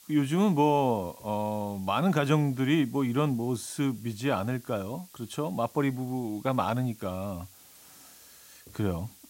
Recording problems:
hiss; faint; throughout; 25 dB below the speech

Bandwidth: 16 kHz